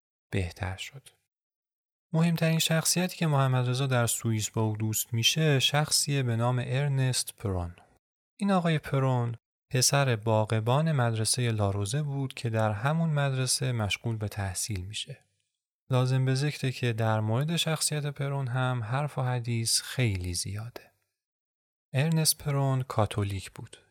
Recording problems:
none

